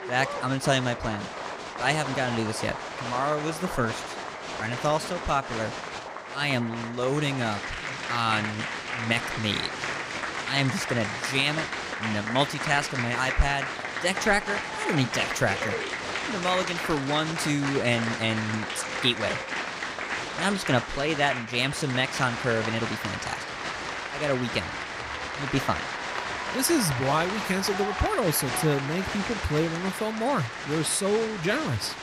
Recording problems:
crowd noise; loud; throughout; 4 dB below the speech

